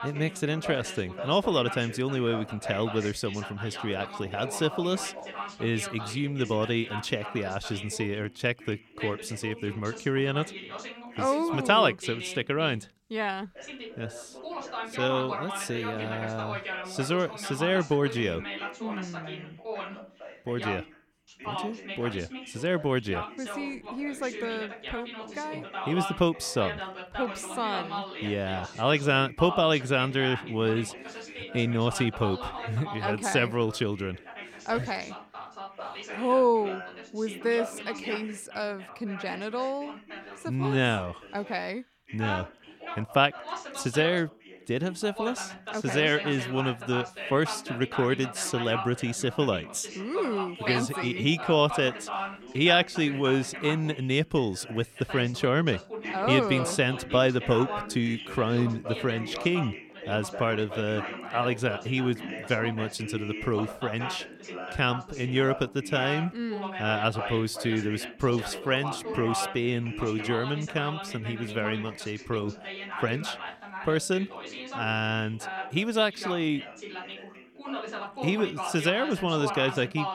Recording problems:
background chatter; loud; throughout; 2 voices, 9 dB below the speech

